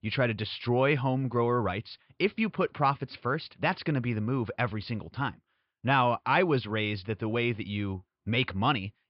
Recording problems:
high frequencies cut off; noticeable; nothing above 5 kHz

